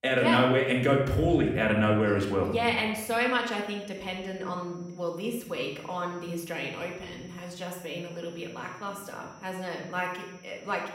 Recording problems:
room echo; noticeable; dies away in 0.8 s
off-mic speech; somewhat distant
high-pitched whine; faint; from 3.5 s on; 6 kHz, 30 dB below the speech

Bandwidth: 16 kHz